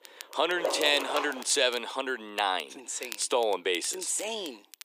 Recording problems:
thin; very; fading below 350 Hz
crackle, like an old record; noticeable; 20 dB below the speech
dog barking; noticeable; at 0.5 s; peak 3 dB below the speech

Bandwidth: 15 kHz